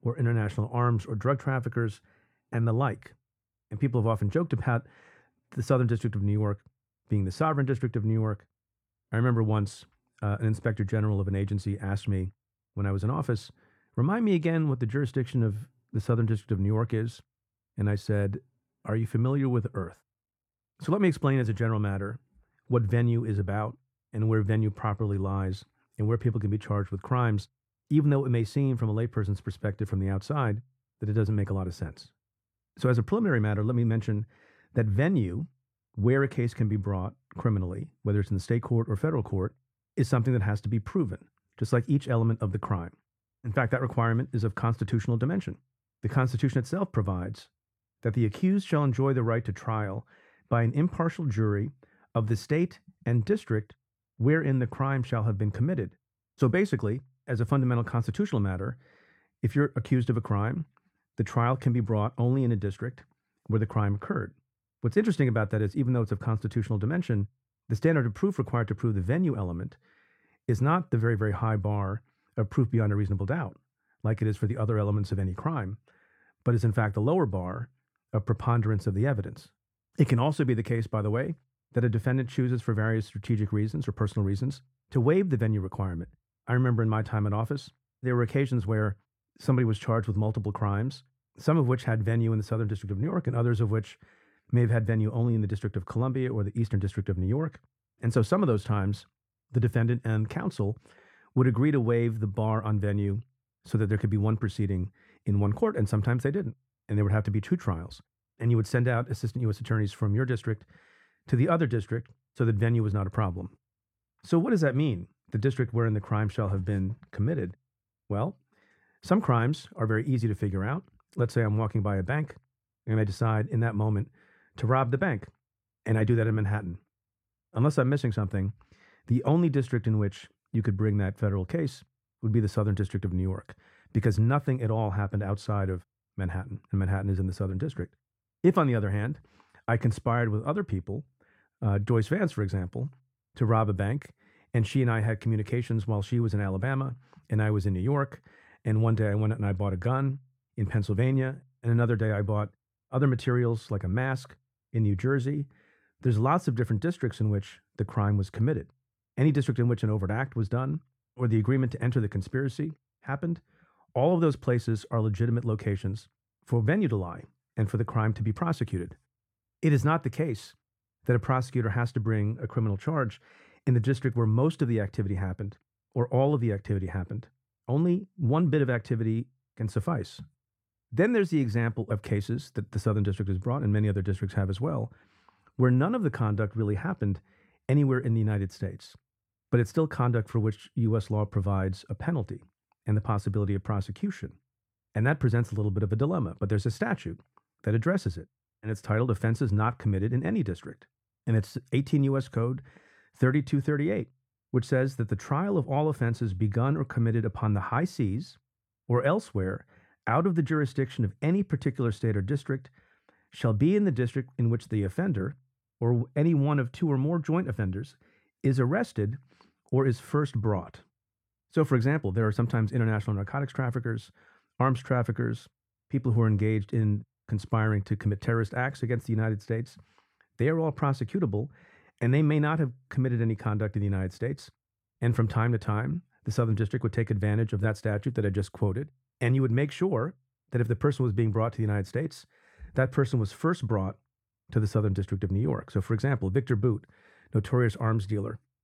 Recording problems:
muffled; slightly; fading above 2.5 kHz

